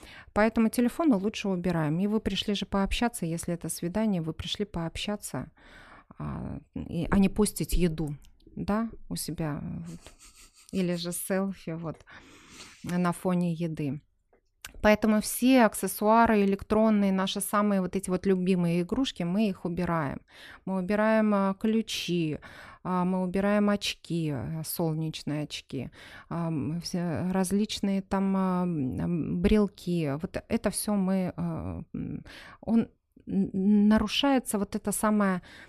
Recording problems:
none

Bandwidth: 13.5 kHz